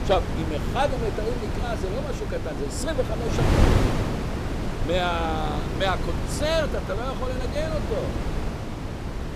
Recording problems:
wind noise on the microphone; heavy; 4 dB below the speech

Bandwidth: 15 kHz